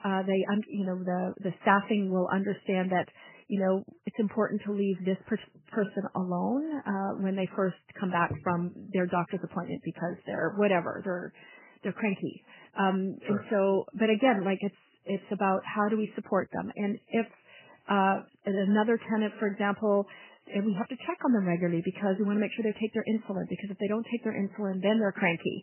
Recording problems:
garbled, watery; badly; nothing above 3 kHz

